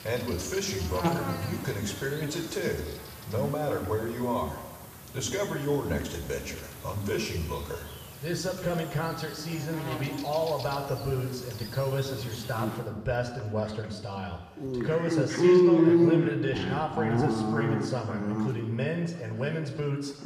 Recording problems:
room echo; slight; dies away in 1.1 s
off-mic speech; somewhat distant
animal sounds; very loud; throughout; 3 dB above the speech

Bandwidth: 14.5 kHz